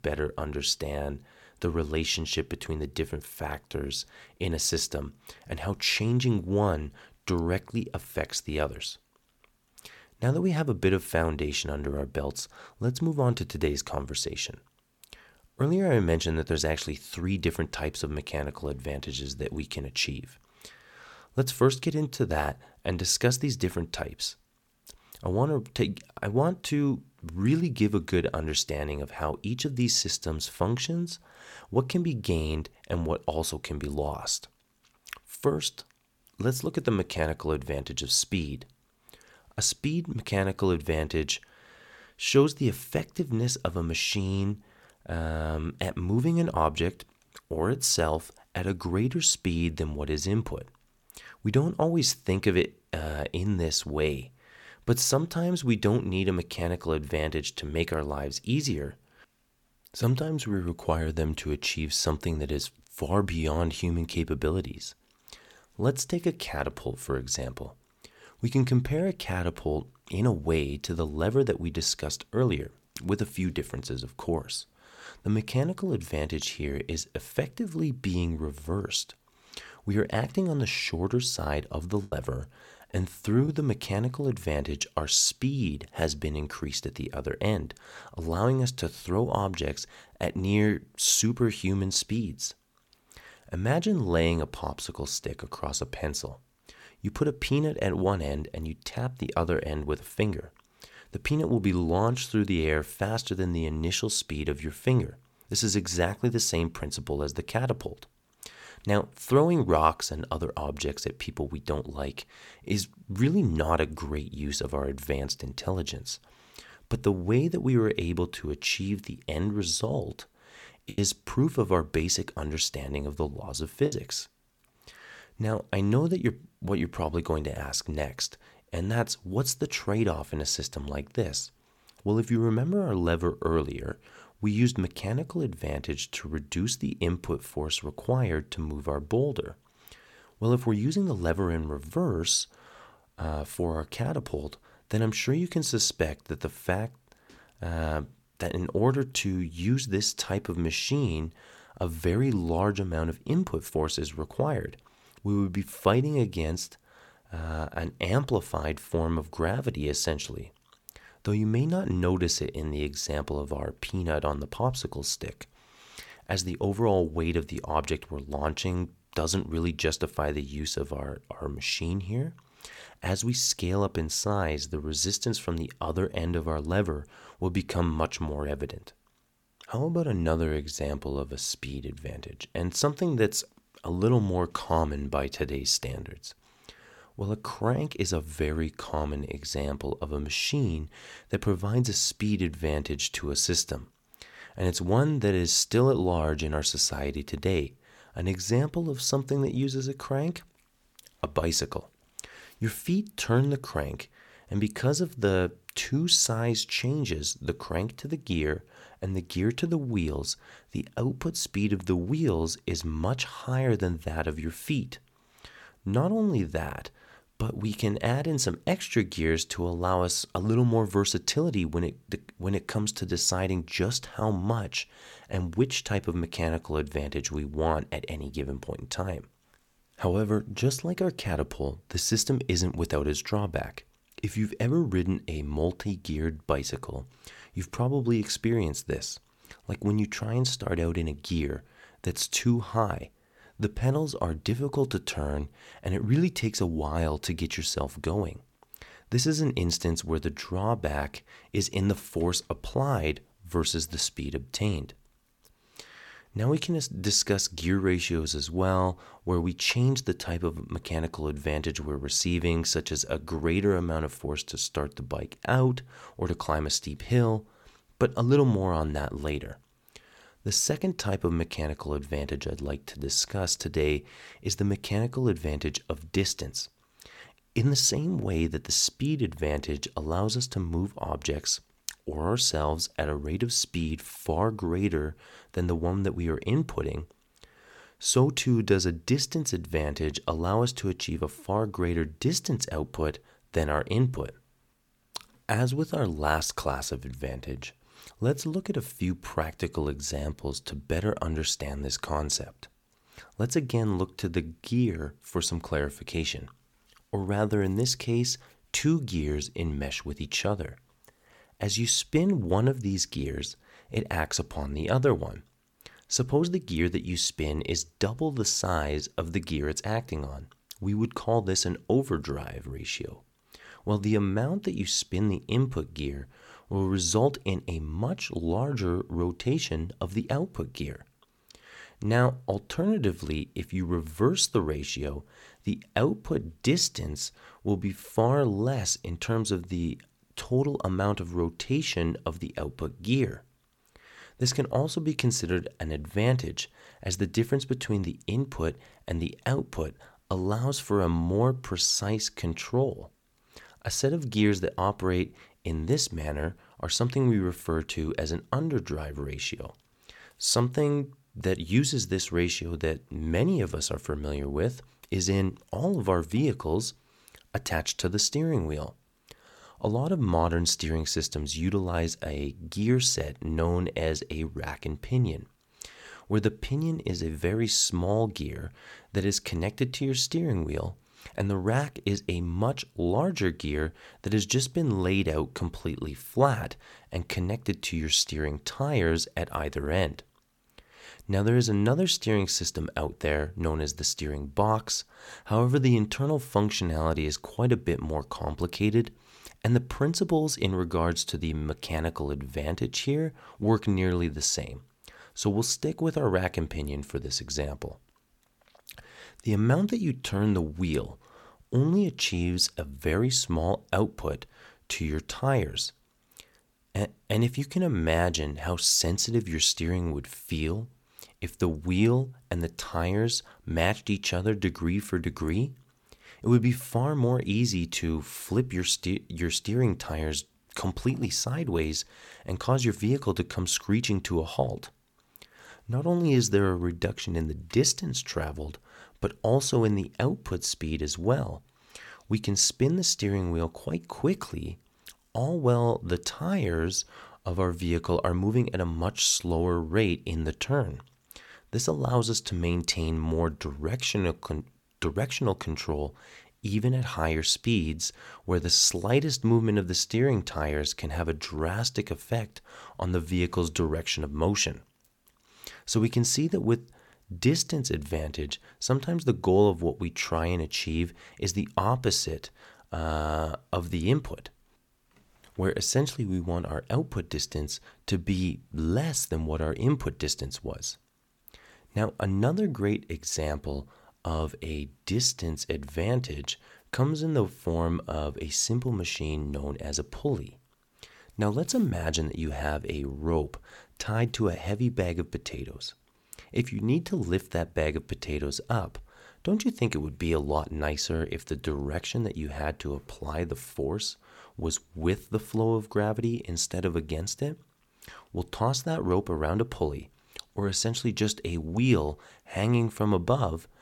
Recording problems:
choppy; occasionally; from 1:22 to 1:23 and from 2:01 to 2:04; 4% of the speech affected

